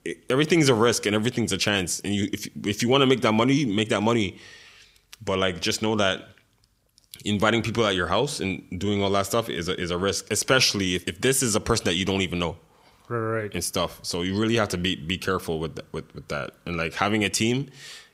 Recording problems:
none

